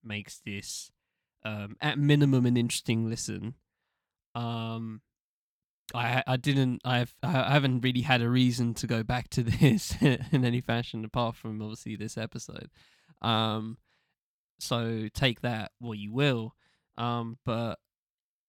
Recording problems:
none

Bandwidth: 19 kHz